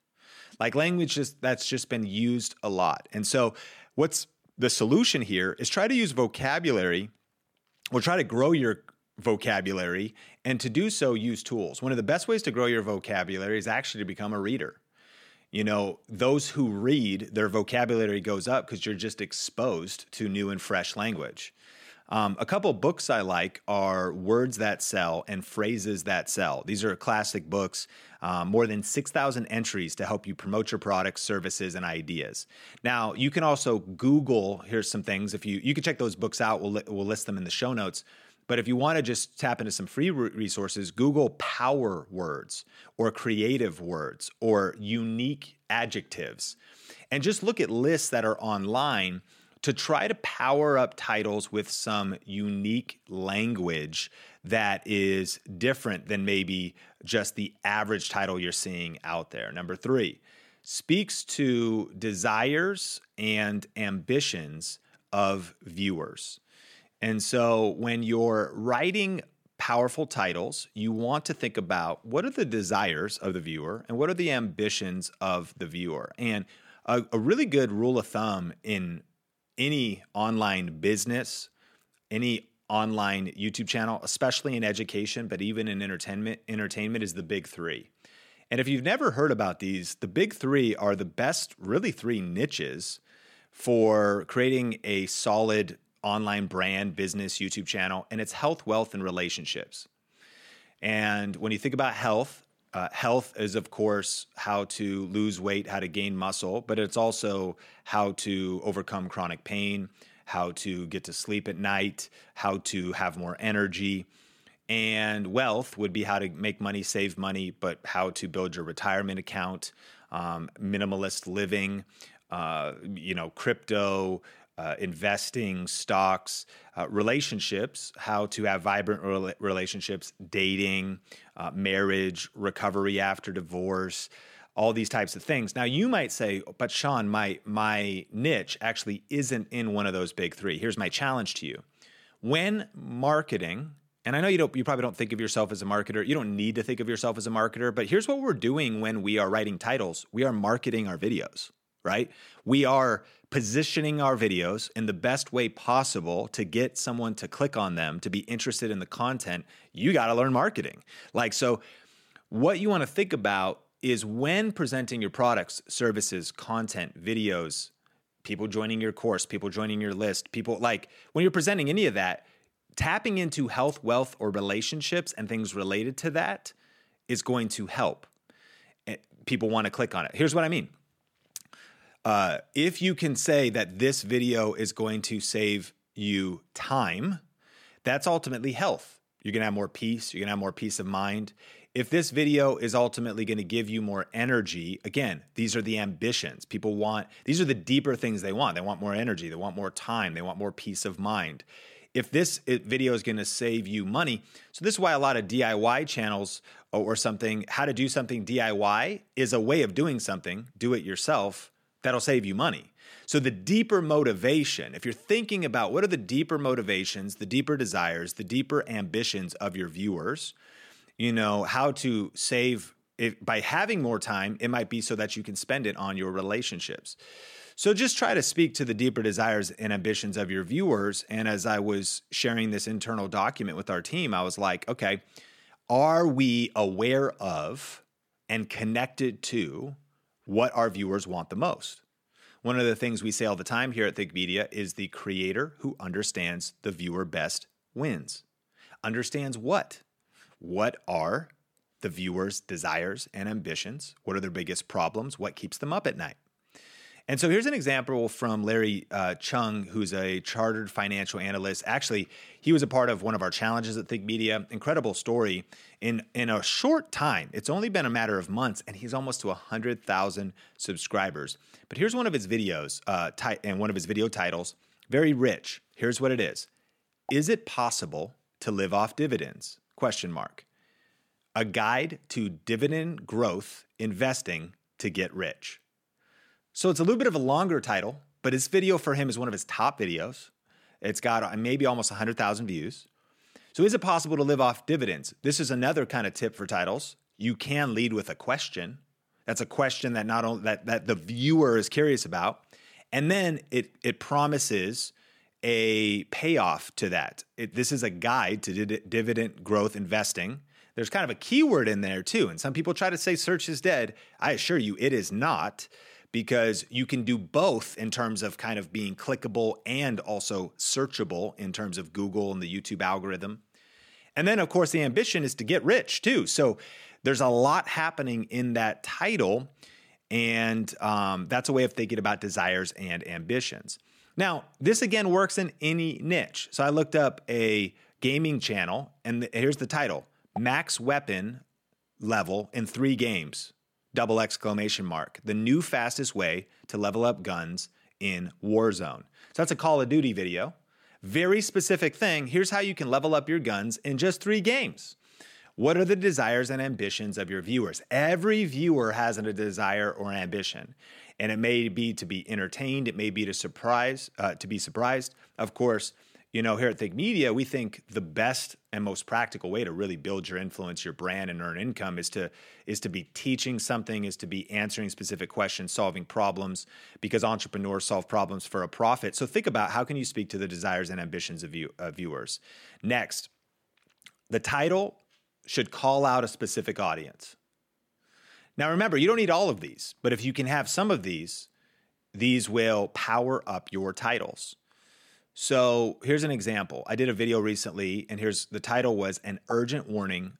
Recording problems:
none

